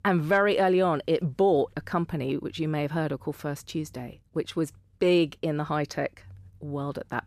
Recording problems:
none

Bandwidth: 14.5 kHz